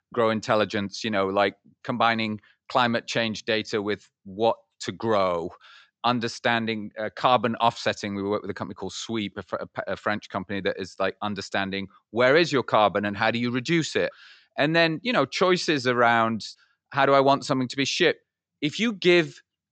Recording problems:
high frequencies cut off; noticeable; nothing above 8 kHz

